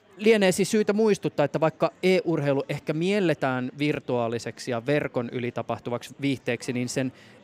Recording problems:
chatter from many people; faint; throughout; 30 dB below the speech

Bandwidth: 15.5 kHz